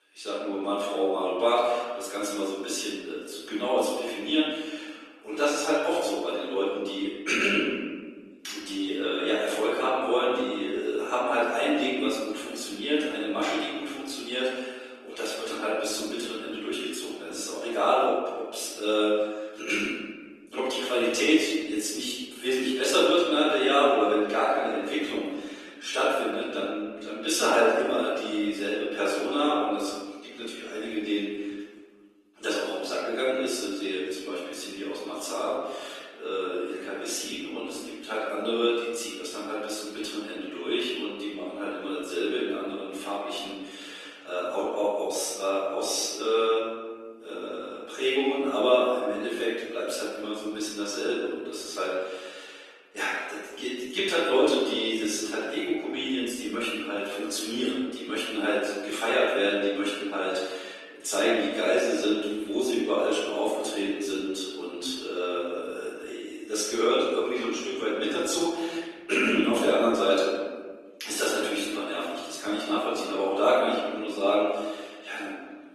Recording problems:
room echo; strong; dies away in 1.3 s
off-mic speech; far
thin; somewhat; fading below 300 Hz
garbled, watery; slightly; nothing above 14 kHz

